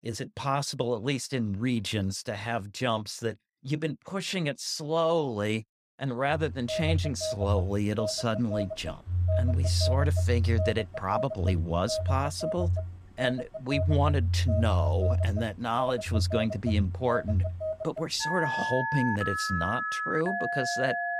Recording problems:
alarms or sirens; very loud; from 6.5 s on; as loud as the speech

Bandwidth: 15 kHz